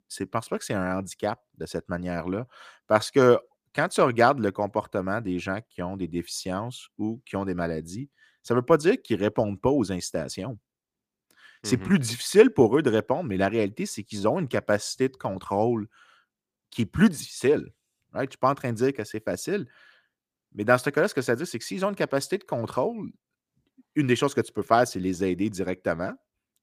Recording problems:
none

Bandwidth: 15 kHz